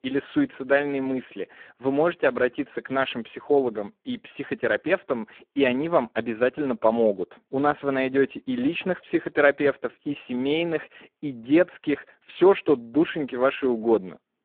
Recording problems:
phone-call audio; poor line

